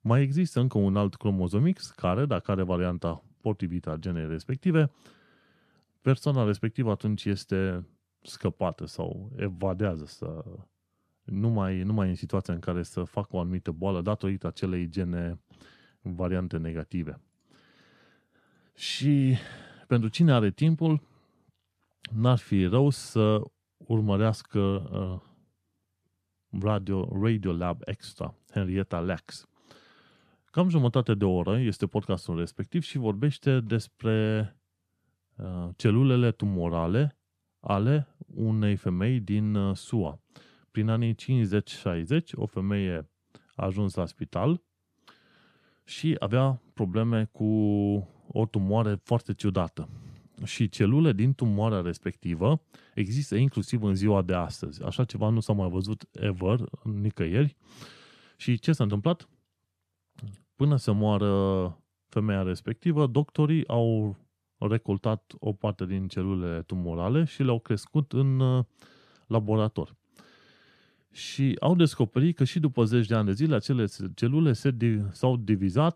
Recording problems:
none

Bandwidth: 14 kHz